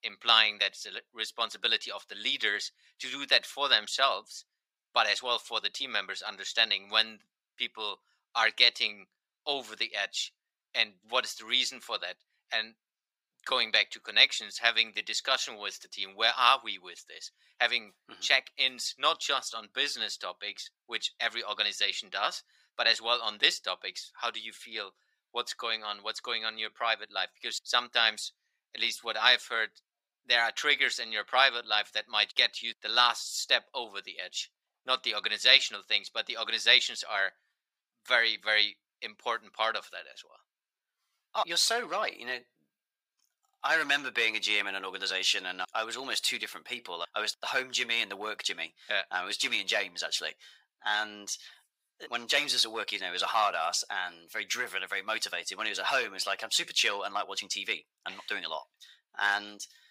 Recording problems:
thin; very; fading below 850 Hz

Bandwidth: 15.5 kHz